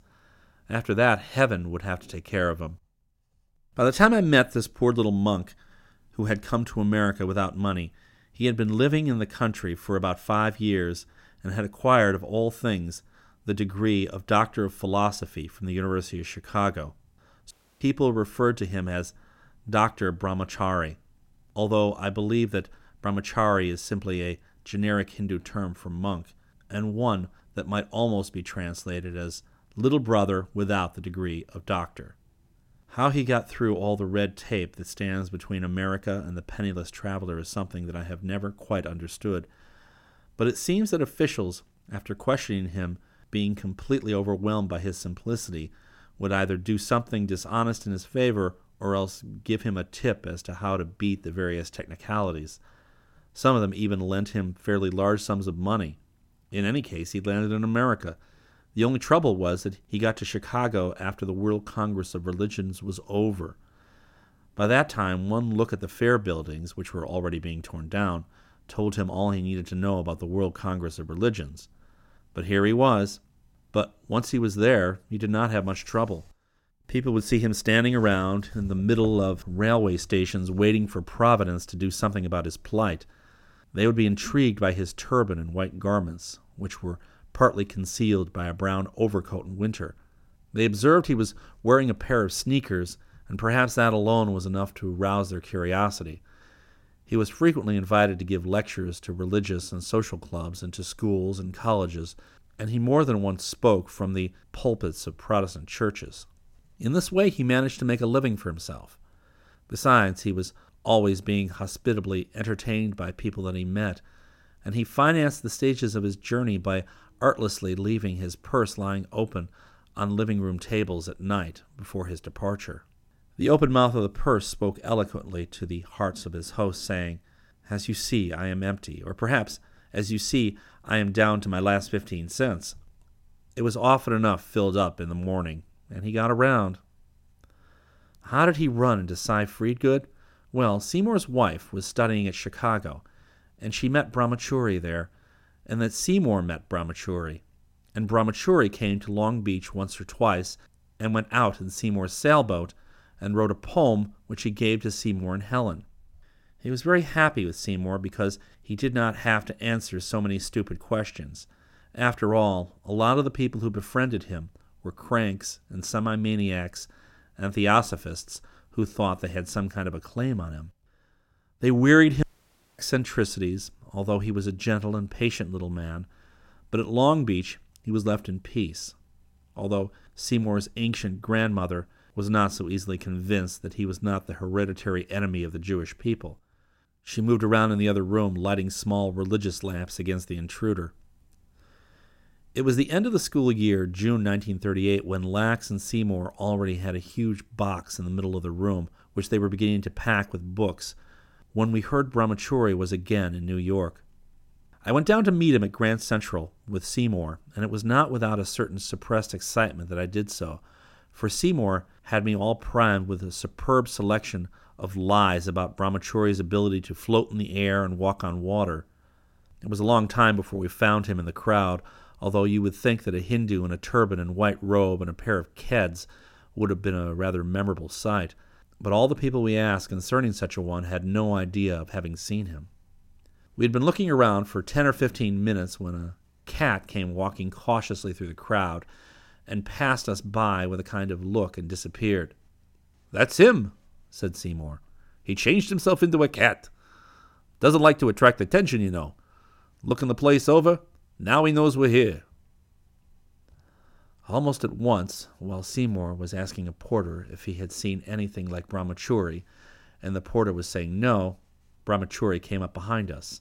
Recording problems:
audio cutting out; at 18 s and at 2:52 for 0.5 s

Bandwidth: 16.5 kHz